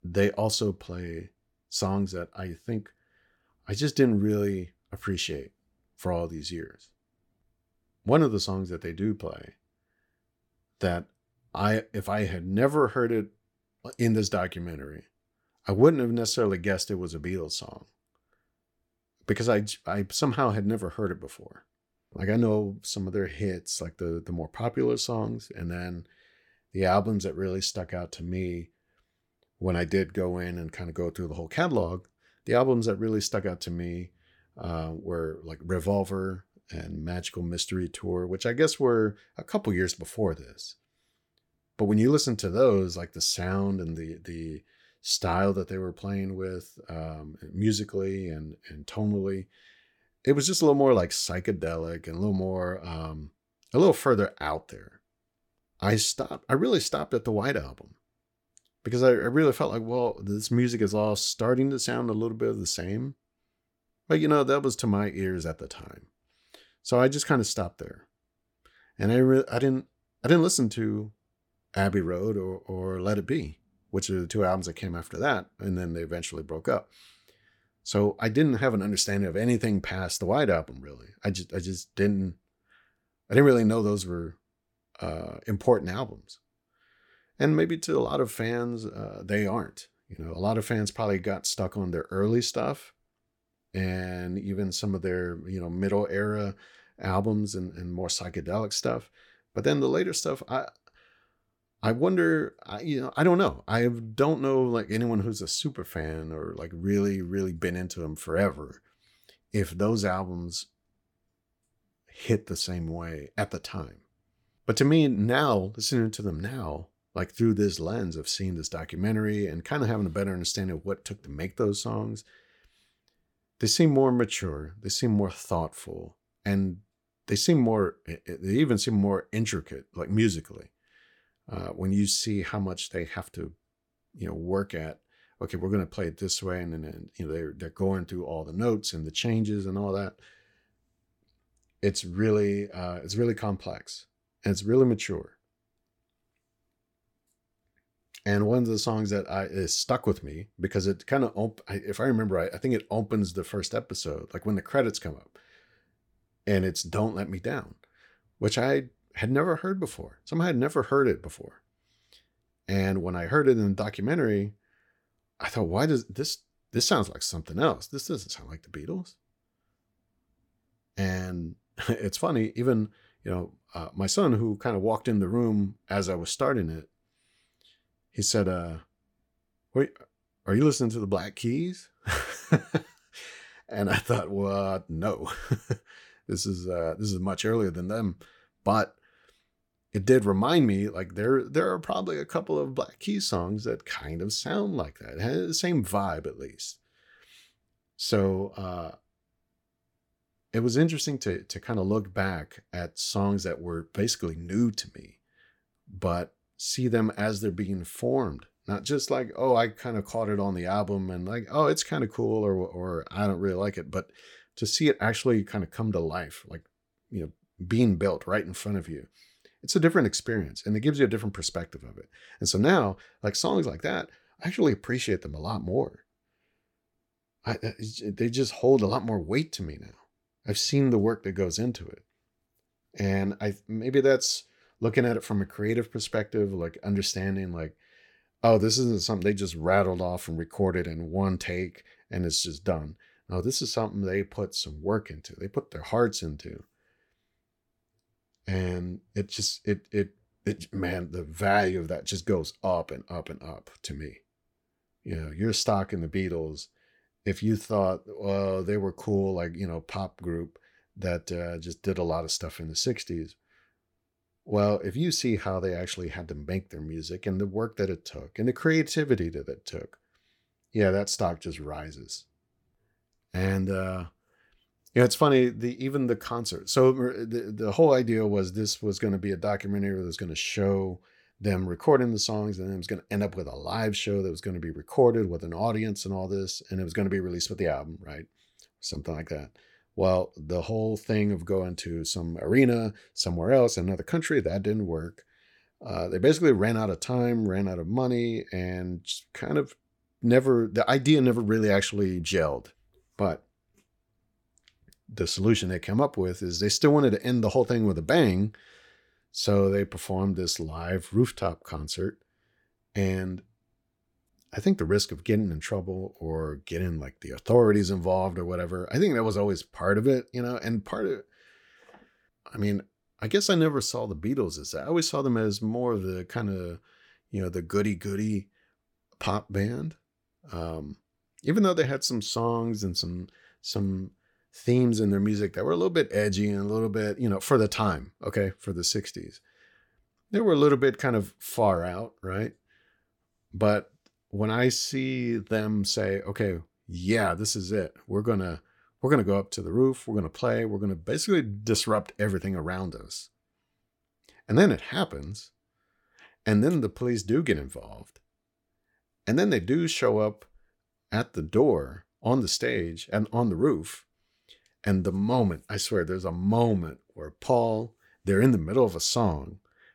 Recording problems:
none

